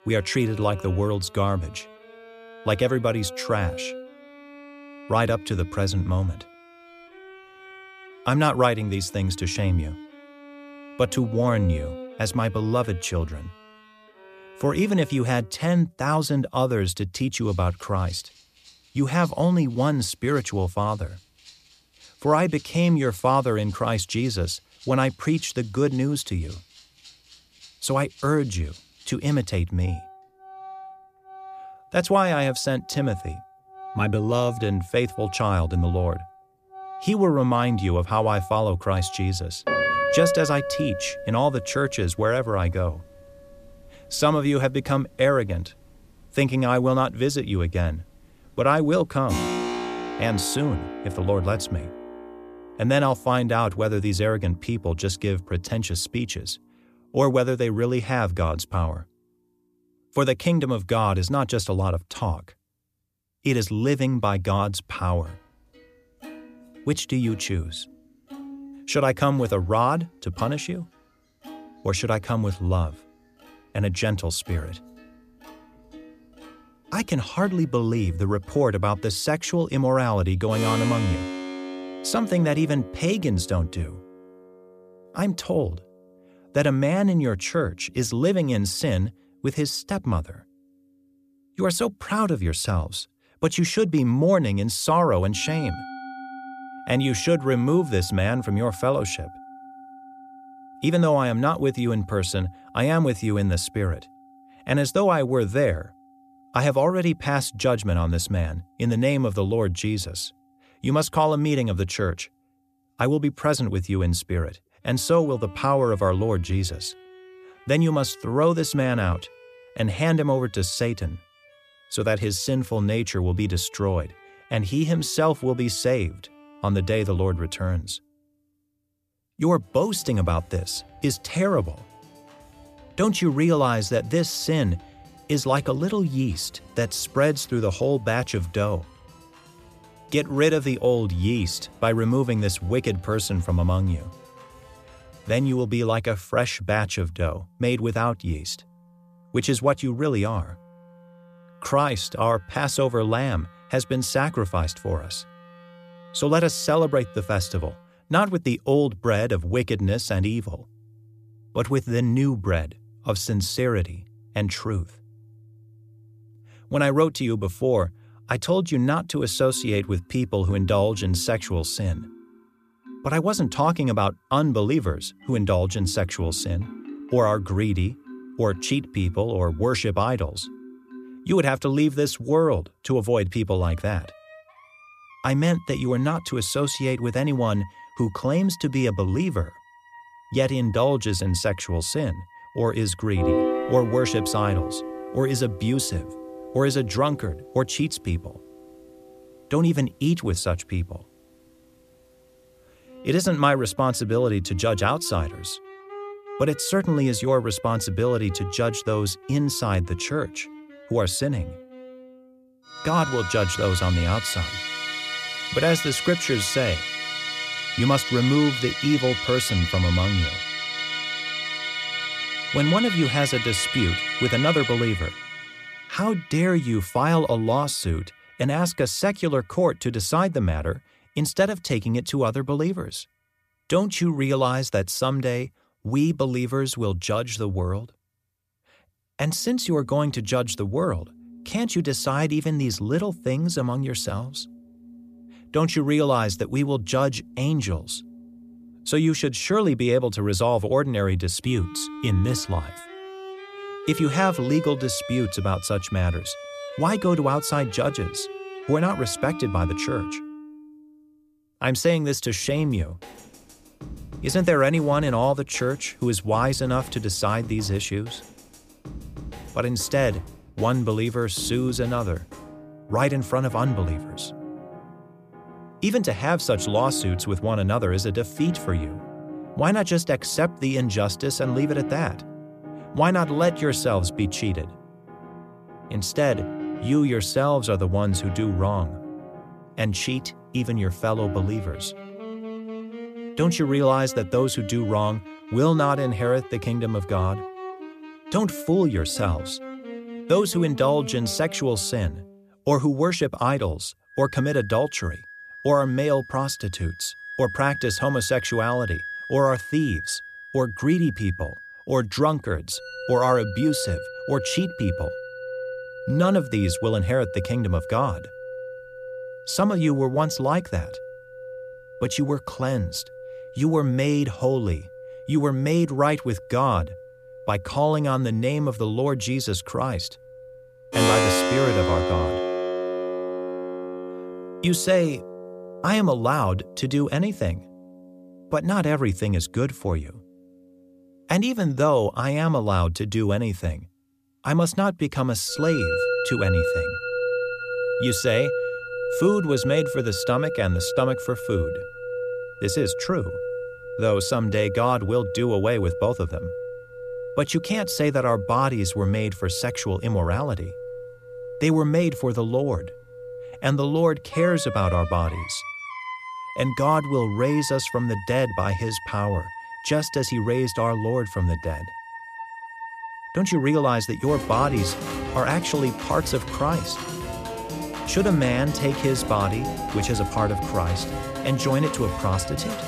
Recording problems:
background music; loud; throughout; 9 dB below the speech

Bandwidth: 14.5 kHz